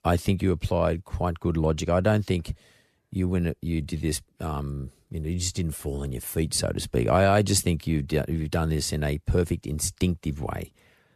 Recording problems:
none

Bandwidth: 14 kHz